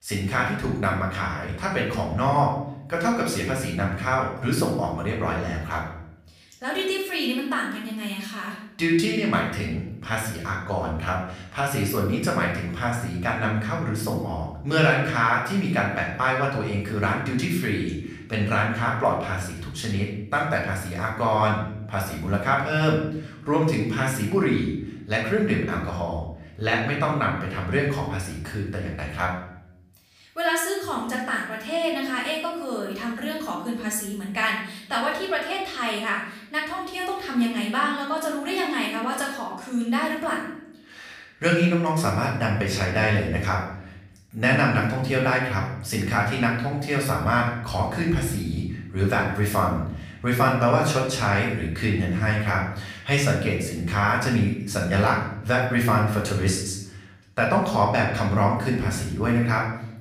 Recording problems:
off-mic speech; far
room echo; noticeable; dies away in 0.7 s

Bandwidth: 15 kHz